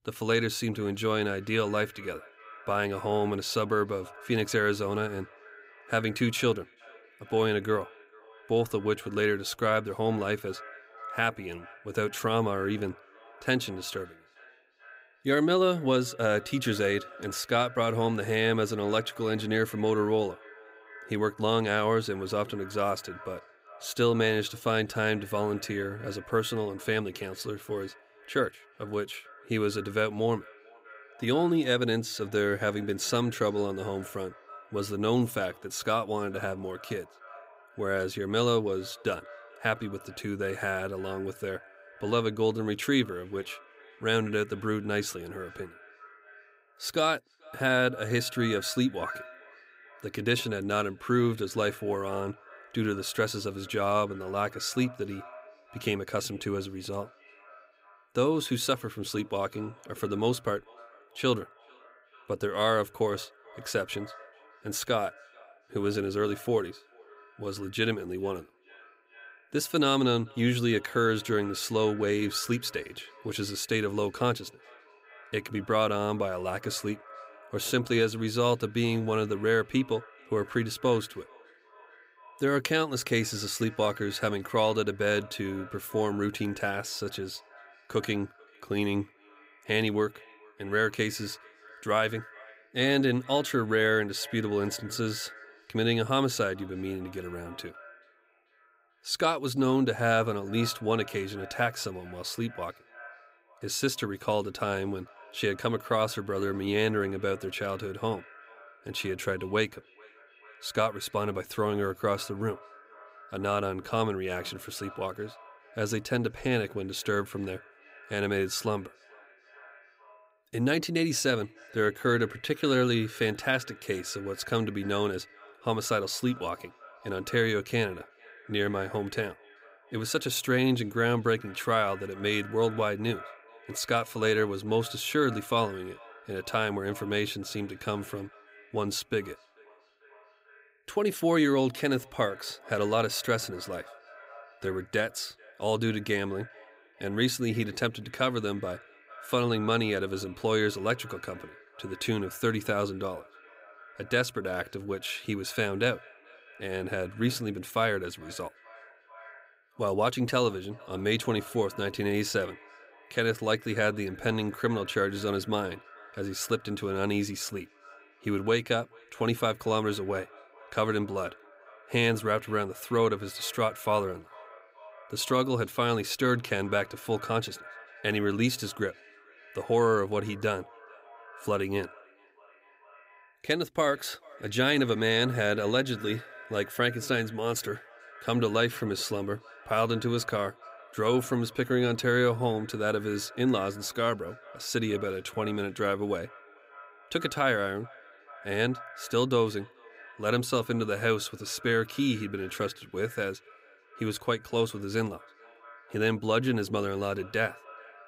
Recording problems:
echo of what is said; faint; throughout; 440 ms later, 20 dB below the speech

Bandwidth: 15.5 kHz